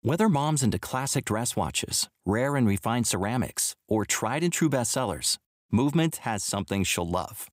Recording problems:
none

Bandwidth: 15.5 kHz